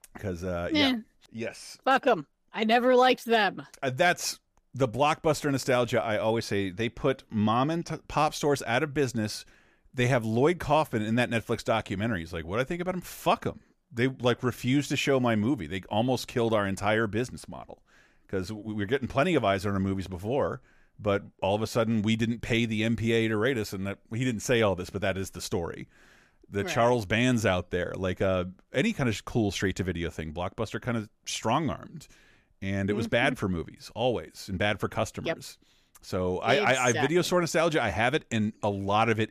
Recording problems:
none

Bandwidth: 15 kHz